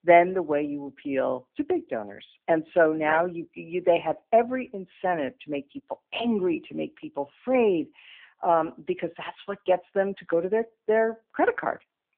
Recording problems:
phone-call audio; poor line

